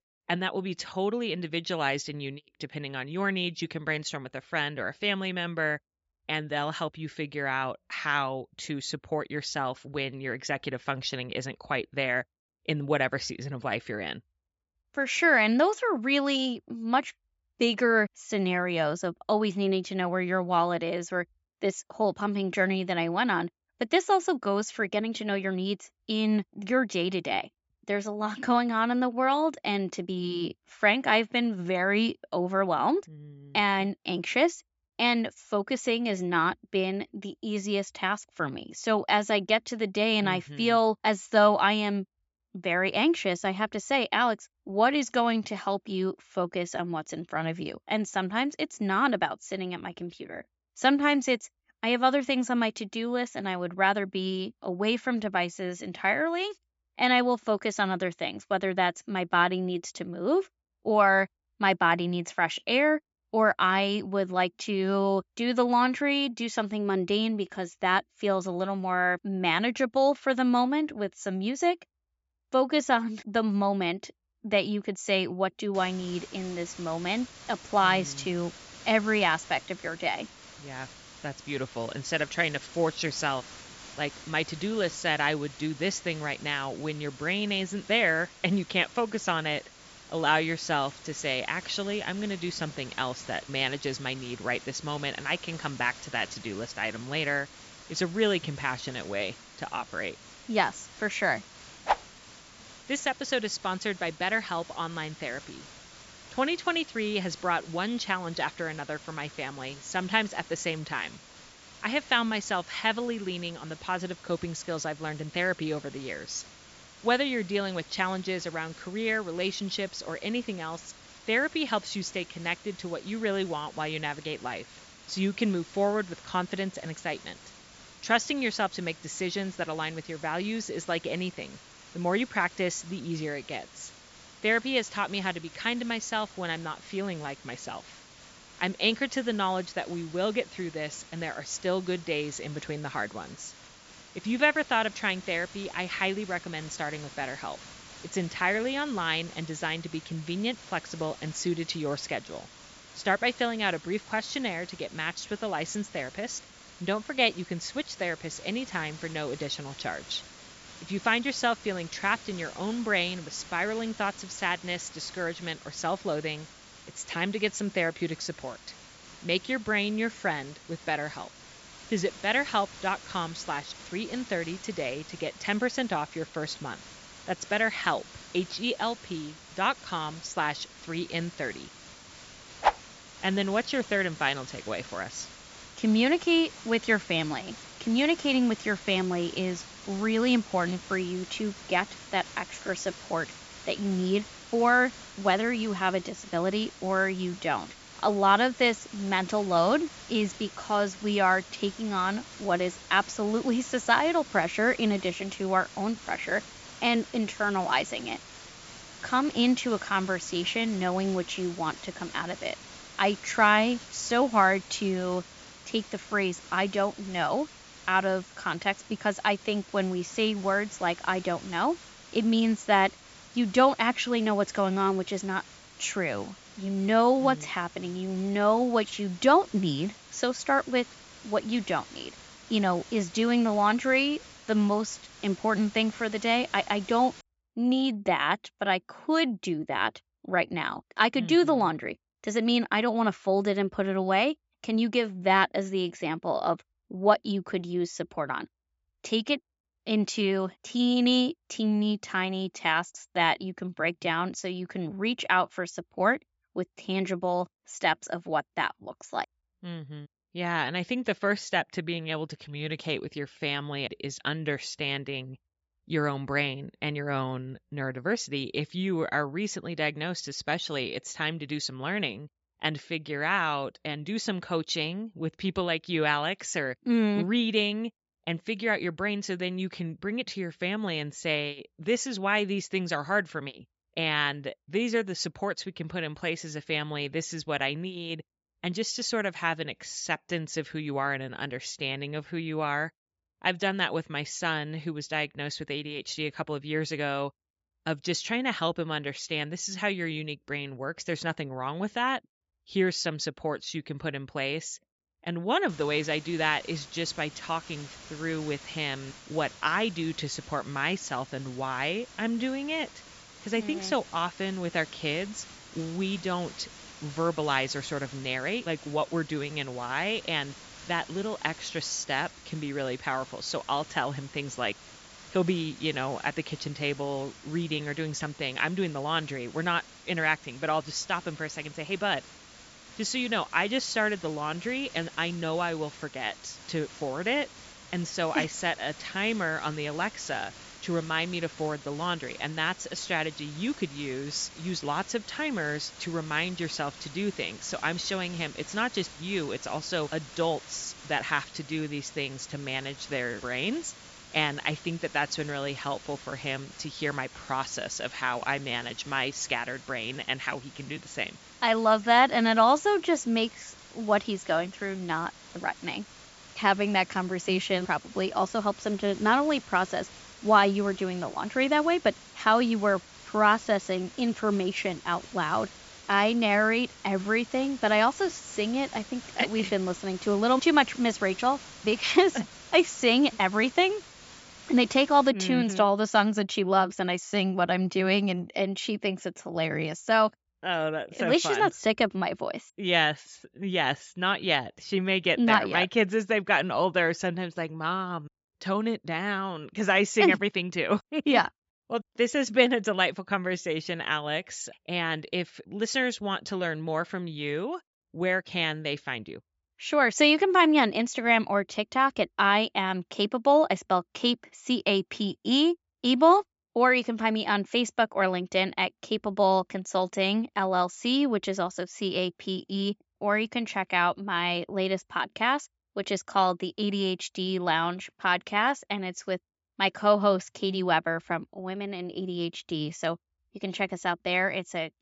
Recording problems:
high frequencies cut off; noticeable; nothing above 7.5 kHz
hiss; noticeable; from 1:16 to 3:57 and from 5:06 to 6:25; 20 dB below the speech

